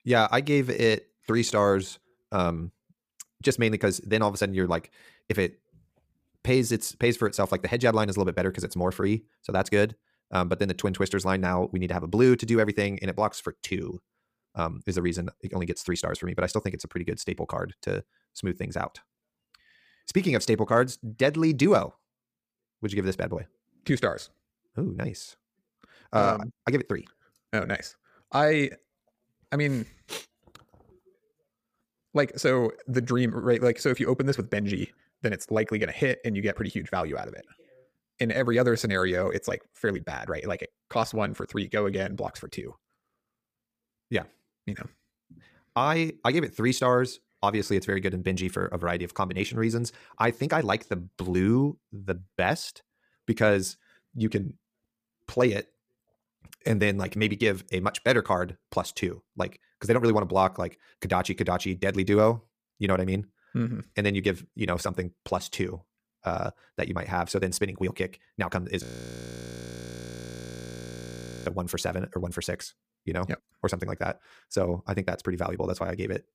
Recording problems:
wrong speed, natural pitch; too fast; 1.6 times normal speed
audio freezing; at 1:09 for 2.5 s

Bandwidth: 15 kHz